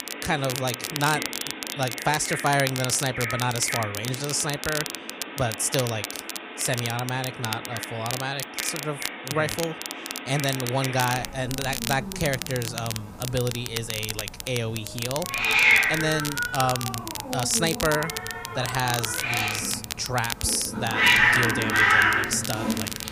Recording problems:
animal sounds; very loud; throughout; 2 dB above the speech
crackle, like an old record; loud; 5 dB below the speech

